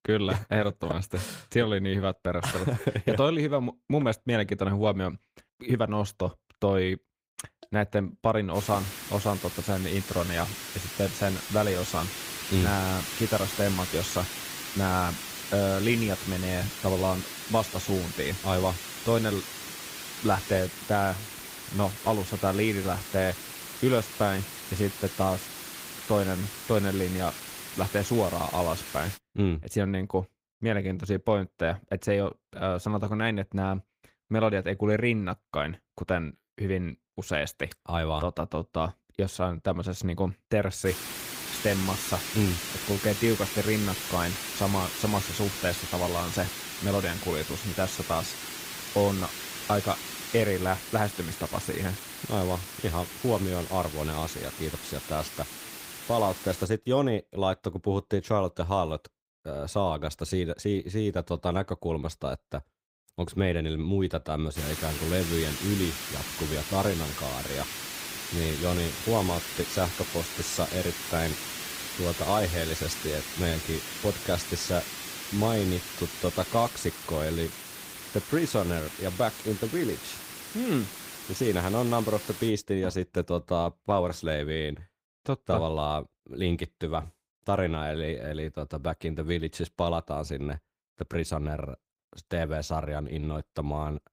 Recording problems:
garbled, watery; slightly; nothing above 15.5 kHz
hiss; loud; from 8.5 to 29 s, from 41 to 57 s and from 1:05 to 1:22; 7 dB below the speech

